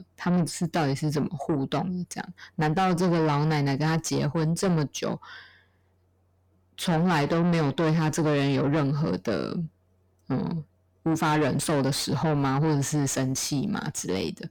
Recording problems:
distortion; heavy; 7 dB below the speech

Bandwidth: 18 kHz